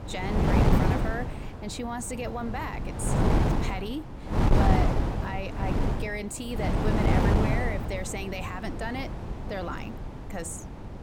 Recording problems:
wind noise on the microphone; heavy; 3 dB above the speech

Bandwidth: 17.5 kHz